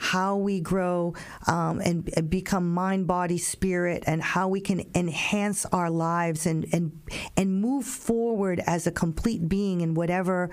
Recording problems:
squashed, flat; heavily

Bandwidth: 15 kHz